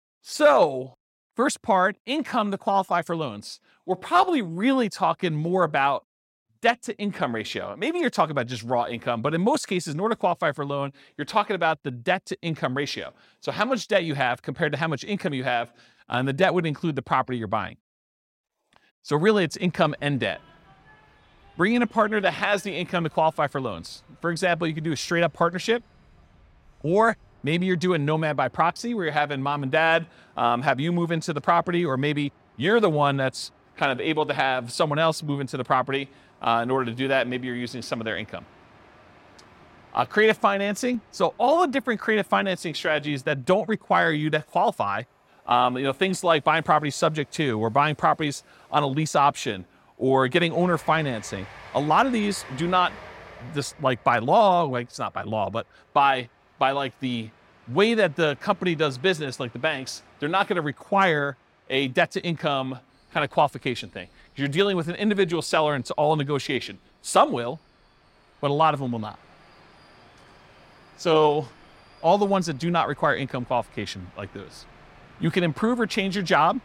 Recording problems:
train or aircraft noise; faint; from 19 s on; 30 dB below the speech

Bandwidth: 16 kHz